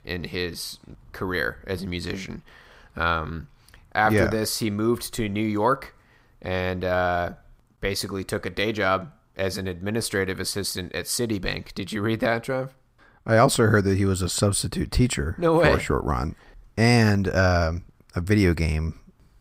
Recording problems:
none

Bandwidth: 15.5 kHz